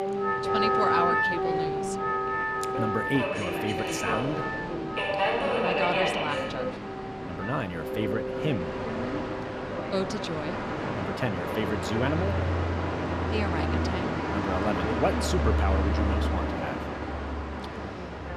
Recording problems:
background music; very loud; throughout; 1 dB above the speech
train or aircraft noise; very loud; throughout; 1 dB above the speech
voice in the background; loud; throughout; 8 dB below the speech

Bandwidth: 14.5 kHz